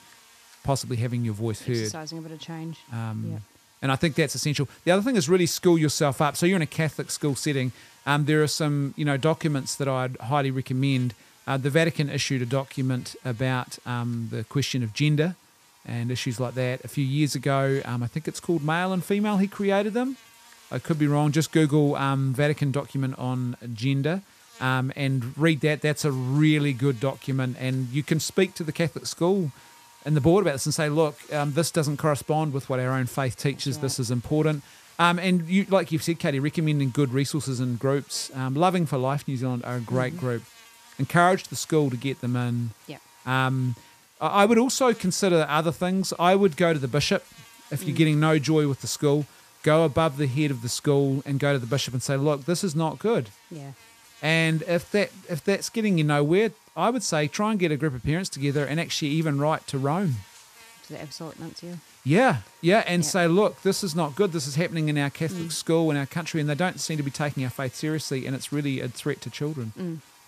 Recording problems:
electrical hum; faint; throughout; 60 Hz, 25 dB below the speech

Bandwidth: 14.5 kHz